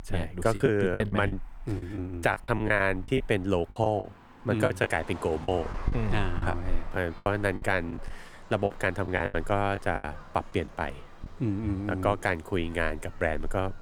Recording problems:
traffic noise; noticeable; throughout; 15 dB below the speech
choppy; very; from 0.5 to 4 s, from 4.5 to 6.5 s and from 7 to 11 s; 15% of the speech affected

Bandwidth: 18.5 kHz